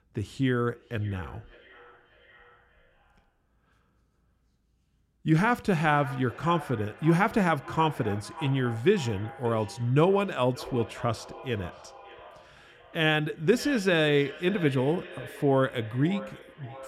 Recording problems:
echo of what is said; noticeable; throughout; 580 ms later, 15 dB below the speech

